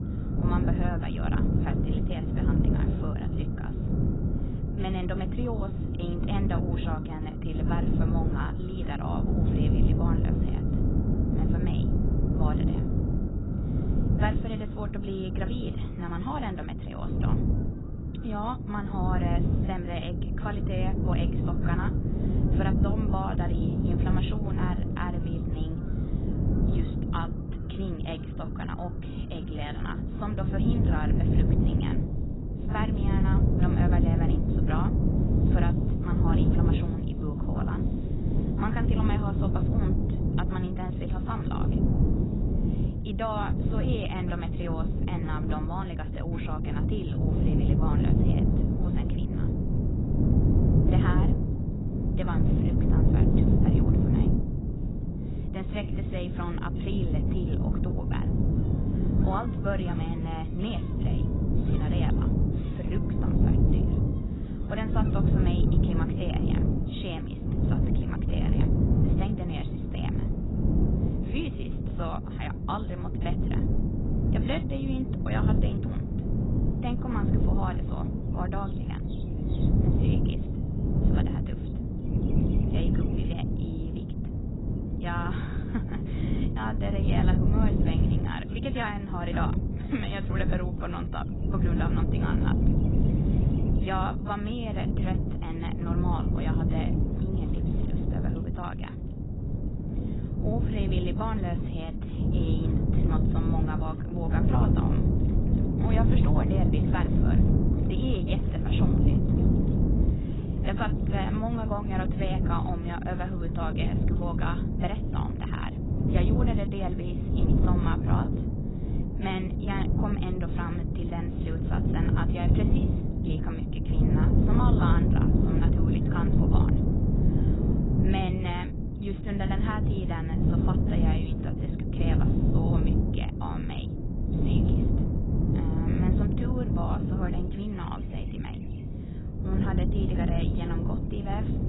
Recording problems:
garbled, watery; badly; nothing above 4 kHz
wind noise on the microphone; heavy; 1 dB above the speech
animal sounds; faint; throughout; 25 dB below the speech

